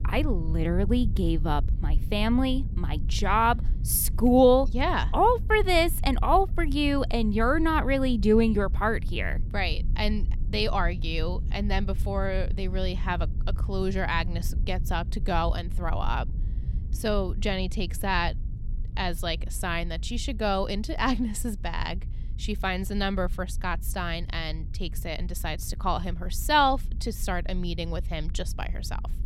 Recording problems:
low rumble; faint; throughout; 20 dB below the speech

